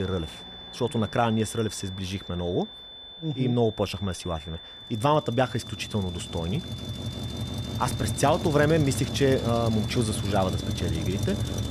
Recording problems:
traffic noise; loud; throughout; 5 dB below the speech
high-pitched whine; noticeable; throughout; 3.5 kHz, 15 dB below the speech
abrupt cut into speech; at the start

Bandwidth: 14.5 kHz